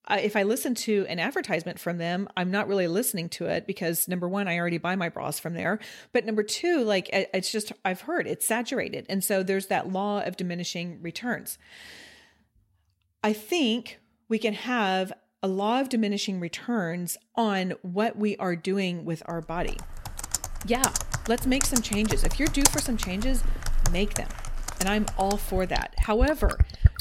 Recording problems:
household noises; loud; from 20 s on; 2 dB below the speech

